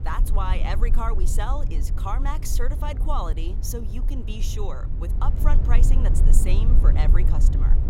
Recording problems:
low rumble; loud; throughout; 8 dB below the speech

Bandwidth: 16 kHz